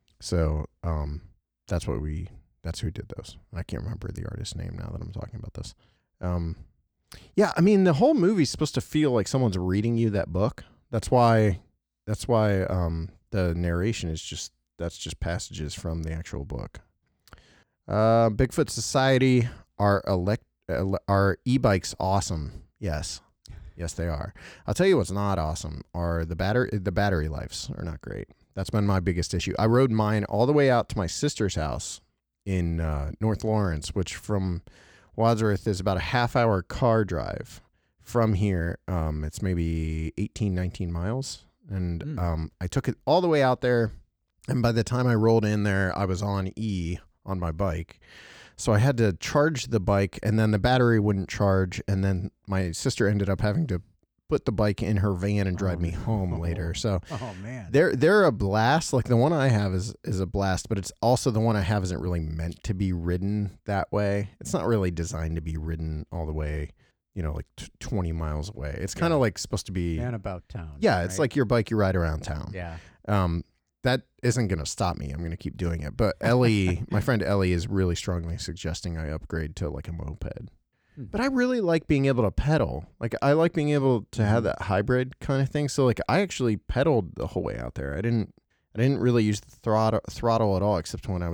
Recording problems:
abrupt cut into speech; at the end

